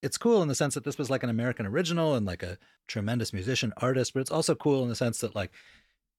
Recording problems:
none

